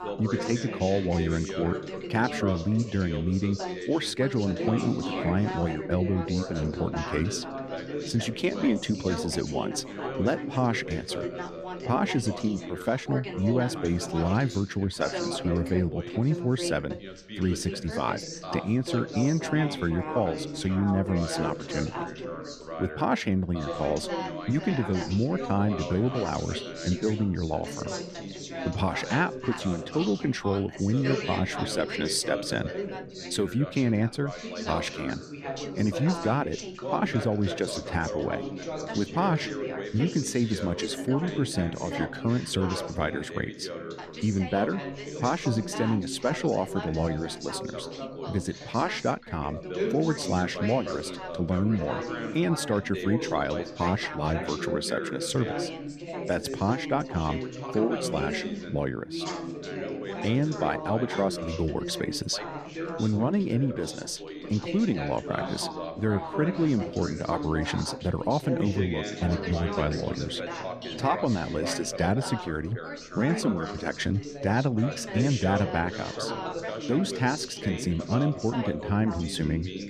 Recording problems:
background chatter; loud; throughout; 3 voices, 6 dB below the speech

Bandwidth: 14.5 kHz